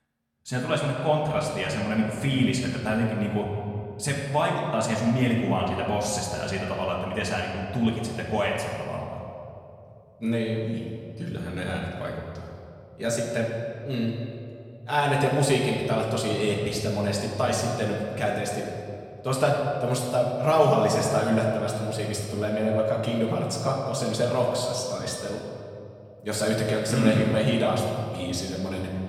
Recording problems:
off-mic speech; far
room echo; noticeable; dies away in 2 s

